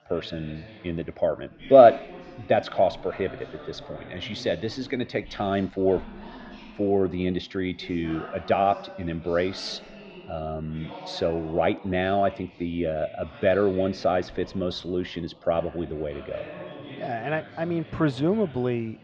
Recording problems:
muffled; slightly; fading above 4 kHz
background chatter; noticeable; throughout; 4 voices, 20 dB below the speech

